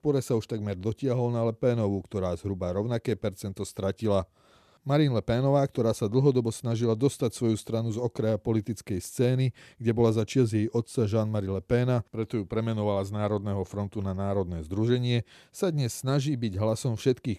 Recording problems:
none

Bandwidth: 14 kHz